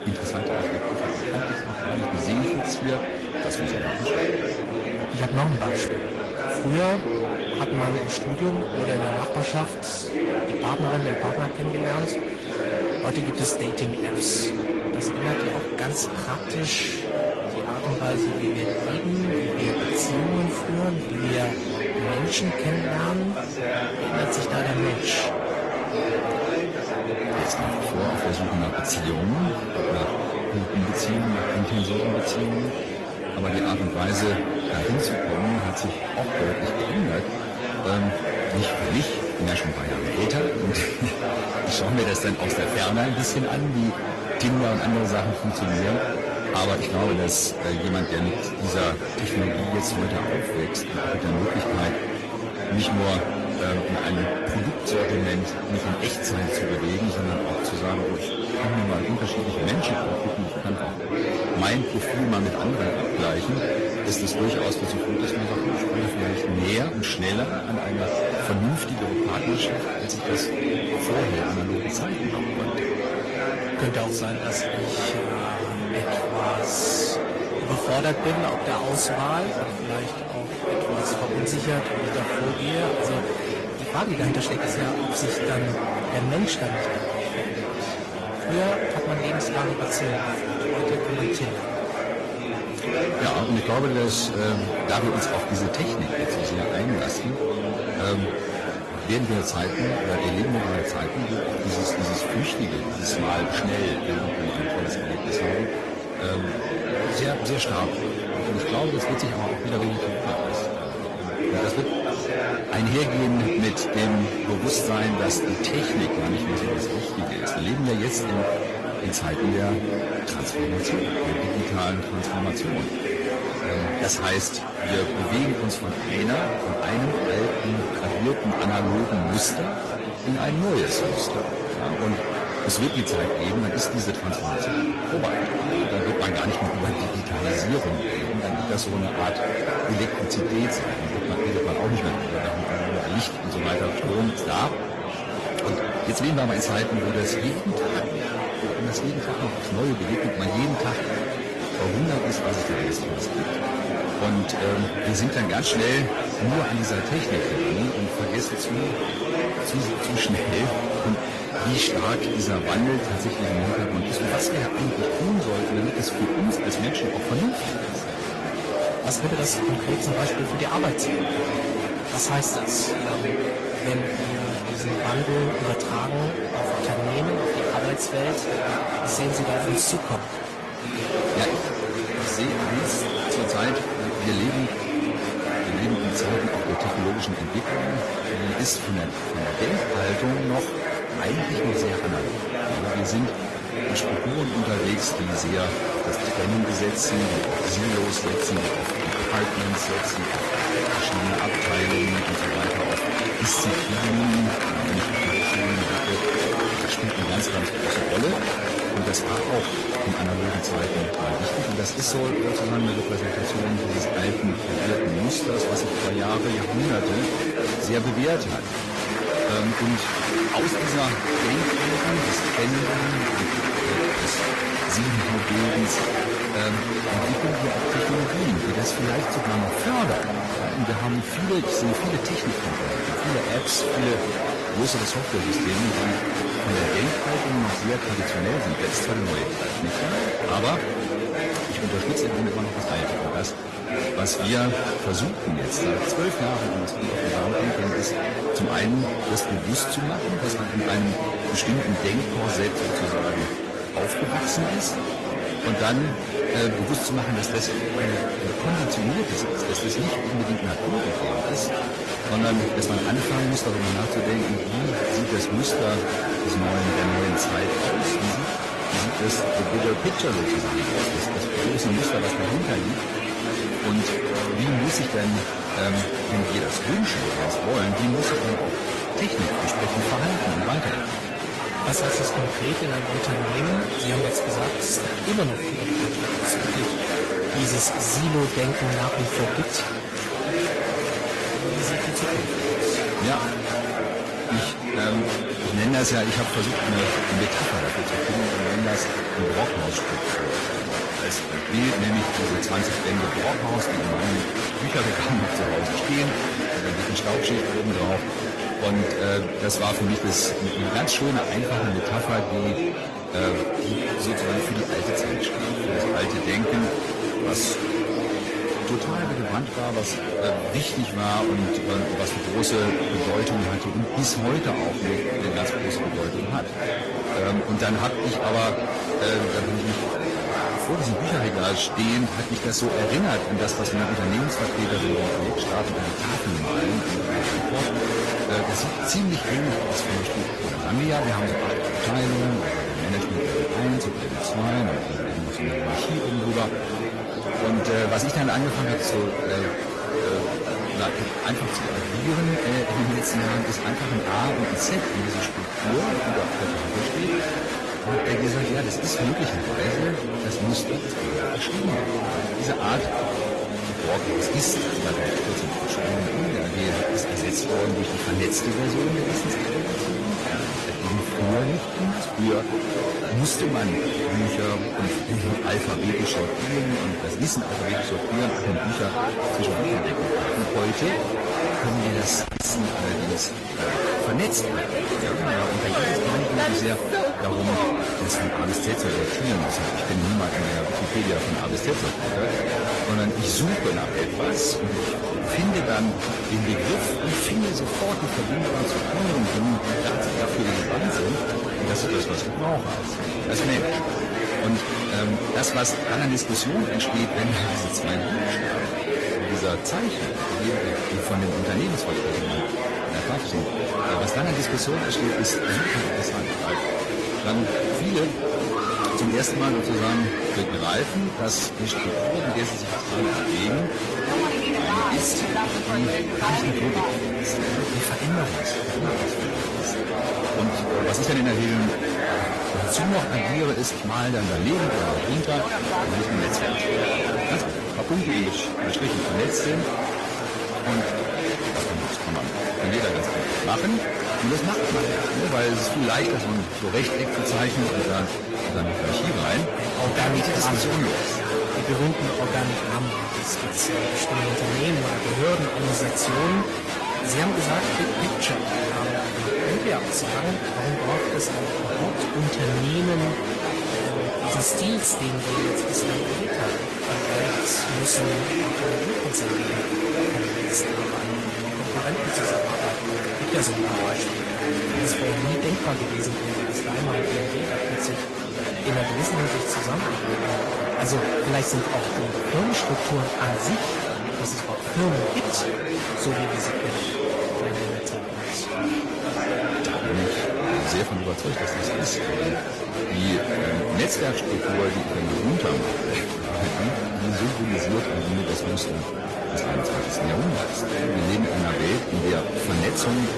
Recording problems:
distortion; slight; 8% of the sound clipped
garbled, watery; slightly; nothing above 10.5 kHz
murmuring crowd; very loud; throughout; 1 dB above the speech
uneven, jittery; strongly; from 22 s to 7:49

